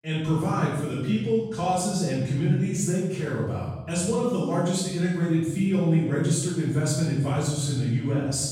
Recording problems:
room echo; strong; dies away in 1.3 s
off-mic speech; far

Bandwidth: 16 kHz